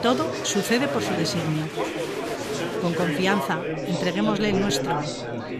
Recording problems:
chatter from many people; loud; throughout; 2 dB below the speech

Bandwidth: 14.5 kHz